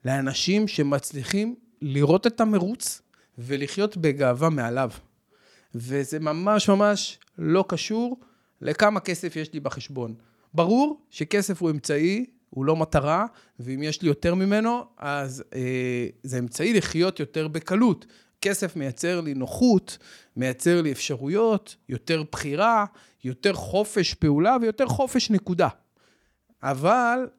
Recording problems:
none

